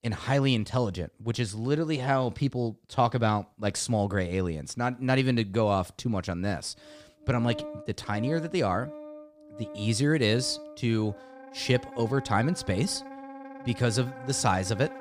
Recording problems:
background music; noticeable; from 7 s on; 15 dB below the speech

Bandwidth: 15 kHz